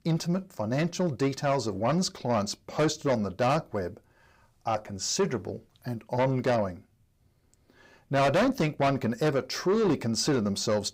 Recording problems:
distortion; heavy; 7 dB below the speech

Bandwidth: 15.5 kHz